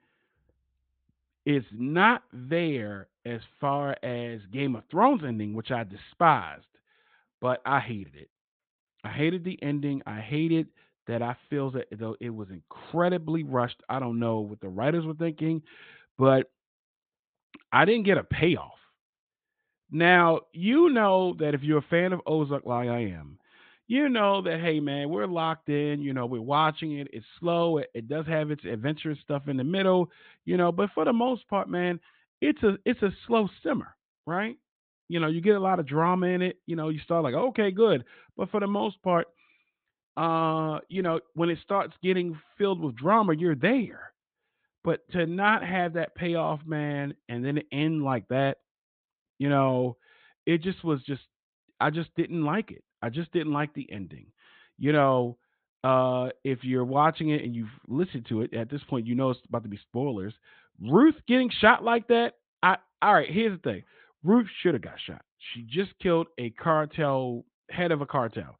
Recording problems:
high frequencies cut off; severe; nothing above 4 kHz

